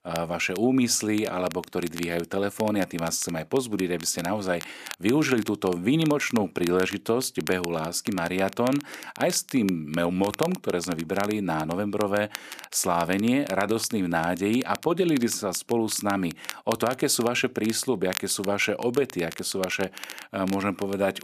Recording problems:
crackle, like an old record; noticeable; 15 dB below the speech

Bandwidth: 14.5 kHz